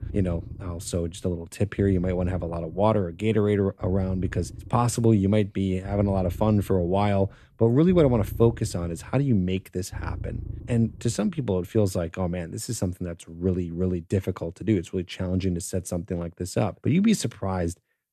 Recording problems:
low rumble; faint; until 12 s; 25 dB below the speech

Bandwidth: 13.5 kHz